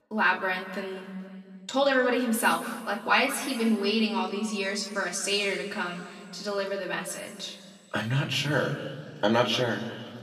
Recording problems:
room echo; noticeable; dies away in 2 s
off-mic speech; somewhat distant

